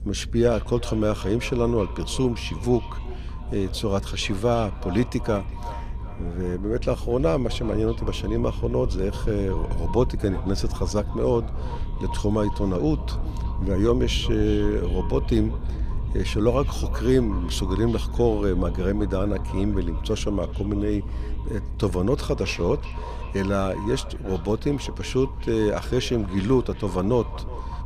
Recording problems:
echo of what is said; noticeable; throughout; 370 ms later, 15 dB below the speech
voice in the background; faint; throughout; 25 dB below the speech
low rumble; faint; throughout; 20 dB below the speech

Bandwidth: 14 kHz